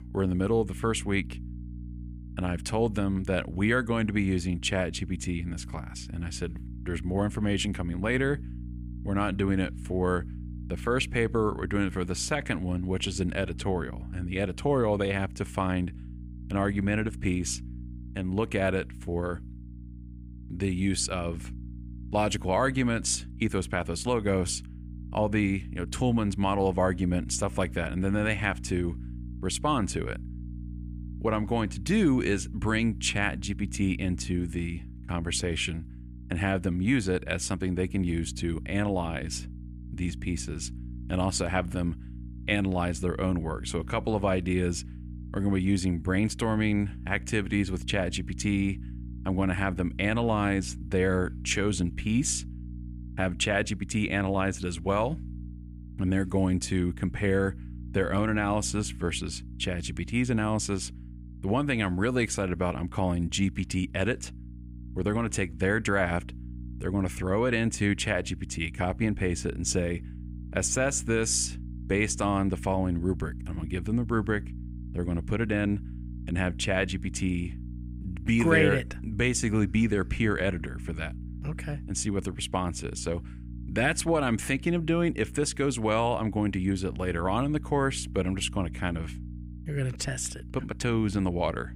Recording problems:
electrical hum; faint; throughout; 60 Hz, 20 dB below the speech

